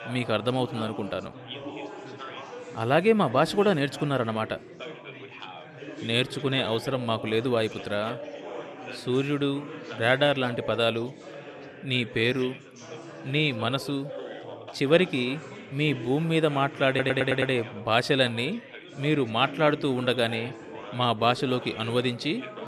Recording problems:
chatter from many people; noticeable; throughout; 15 dB below the speech
audio stuttering; at 17 s

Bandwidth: 13.5 kHz